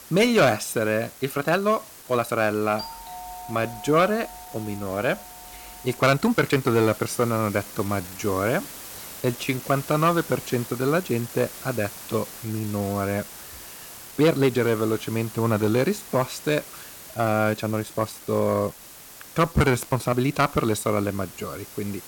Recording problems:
distortion; slight; 10 dB below the speech
hiss; noticeable; throughout; 15 dB below the speech
uneven, jittery; strongly; from 1 to 21 s
doorbell; faint; from 3 to 6 s; peak 15 dB below the speech

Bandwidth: 17 kHz